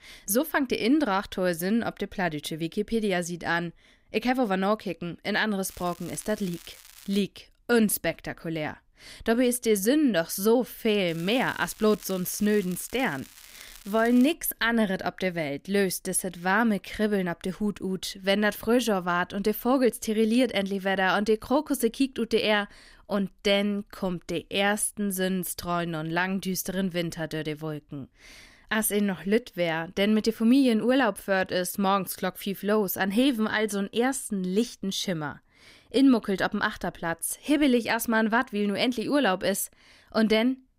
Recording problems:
crackling; faint; from 5.5 to 7 s and from 11 to 14 s; 20 dB below the speech

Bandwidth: 15.5 kHz